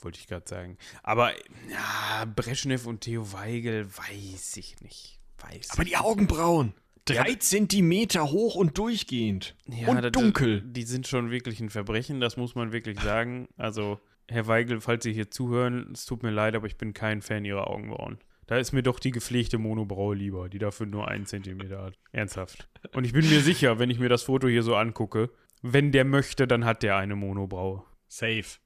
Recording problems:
none

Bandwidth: 14.5 kHz